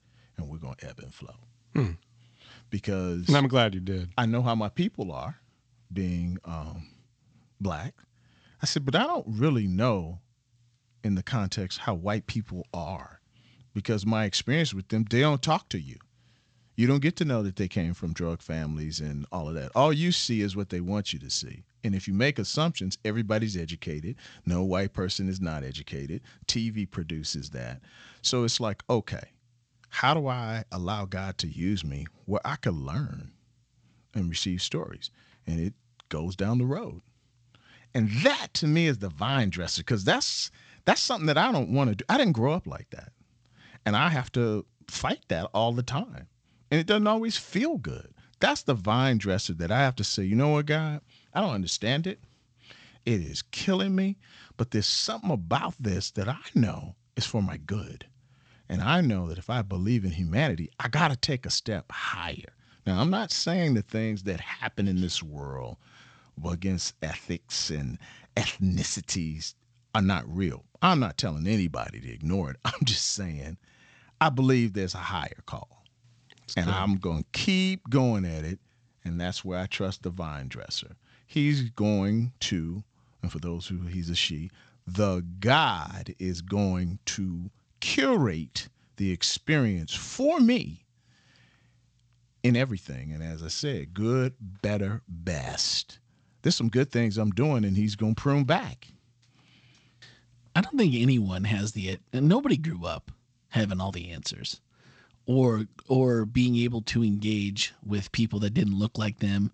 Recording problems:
garbled, watery; slightly; nothing above 8 kHz

